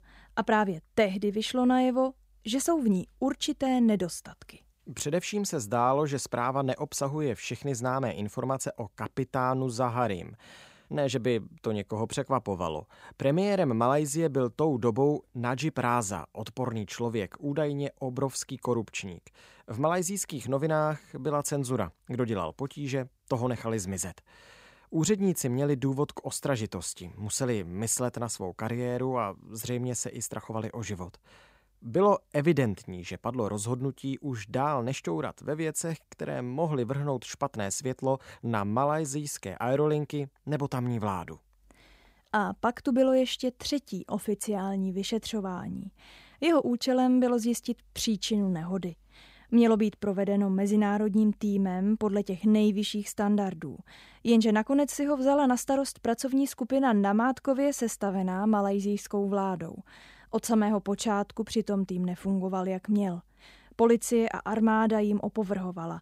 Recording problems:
none

